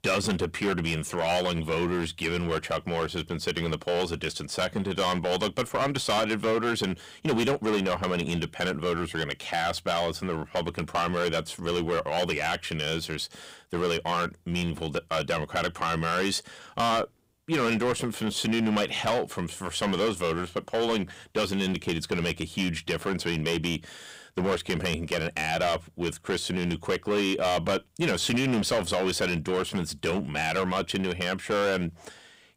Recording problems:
distortion; heavy; 11% of the sound clipped

